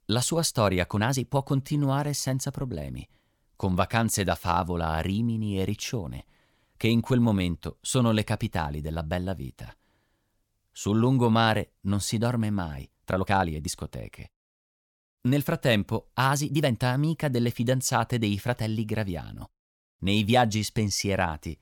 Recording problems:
uneven, jittery; strongly; from 1 to 17 s

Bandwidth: 18 kHz